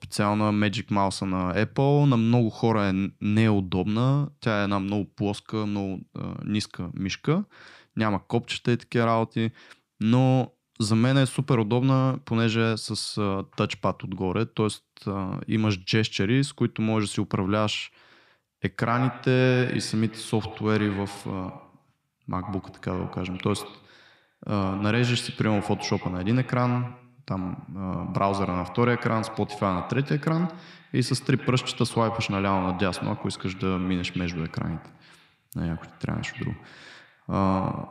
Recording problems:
echo of what is said; noticeable; from 19 s on; 100 ms later, 15 dB below the speech

